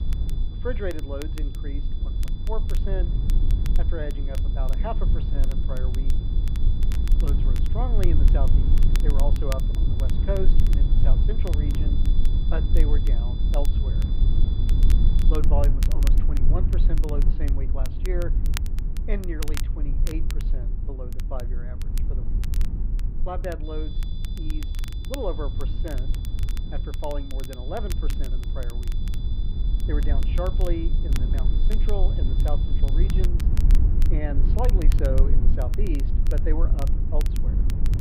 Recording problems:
muffled; slightly; fading above 3 kHz
low rumble; loud; throughout; 6 dB below the speech
high-pitched whine; noticeable; until 15 s and from 24 to 33 s; 3.5 kHz, 15 dB below the speech
crackle, like an old record; noticeable; 10 dB below the speech

